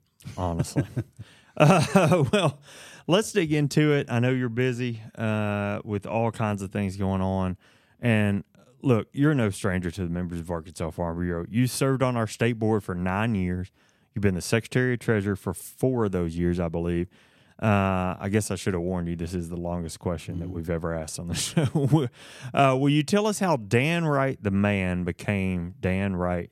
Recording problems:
none

